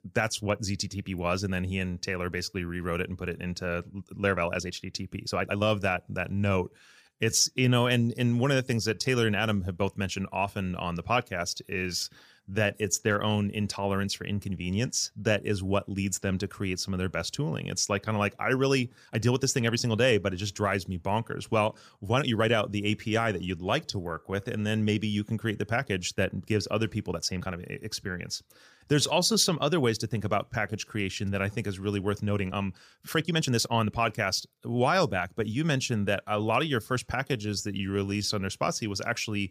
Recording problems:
uneven, jittery; strongly; from 4 to 38 s

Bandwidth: 15 kHz